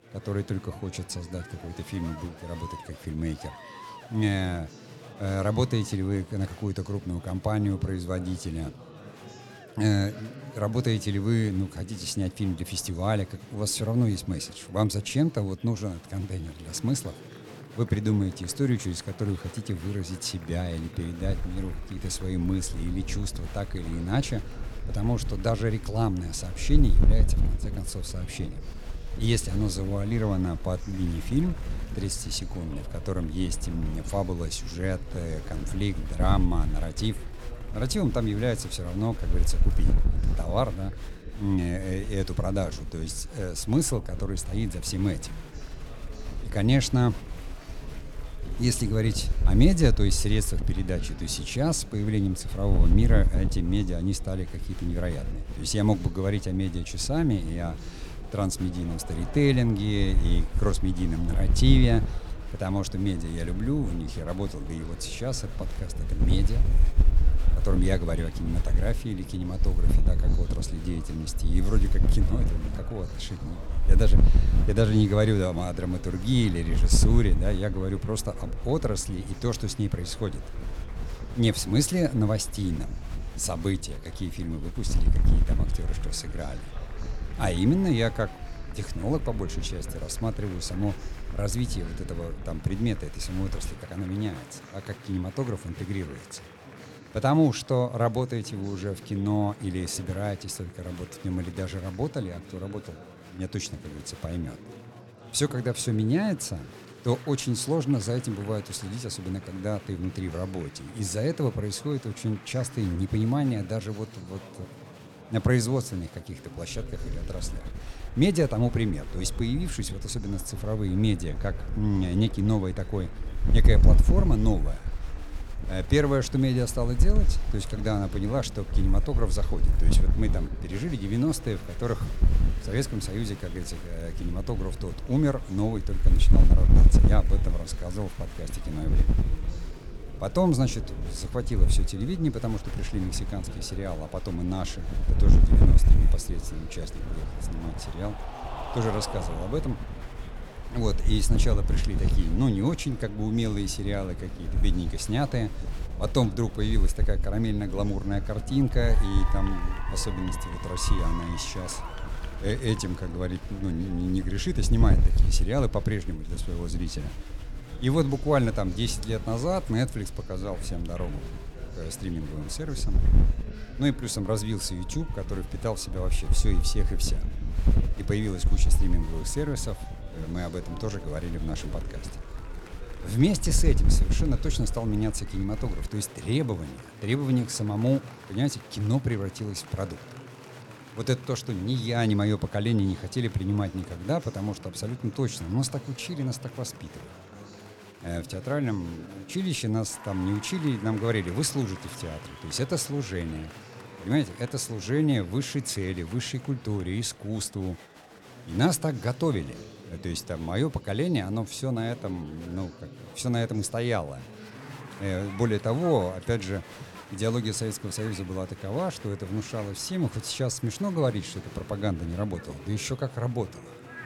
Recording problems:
chatter from many people; noticeable; throughout; 15 dB below the speech
wind noise on the microphone; occasional gusts; from 21 s to 1:34 and from 1:57 to 3:06; 10 dB below the speech

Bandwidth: 17.5 kHz